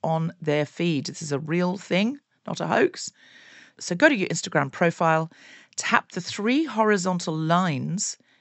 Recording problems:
high frequencies cut off; noticeable; nothing above 8 kHz

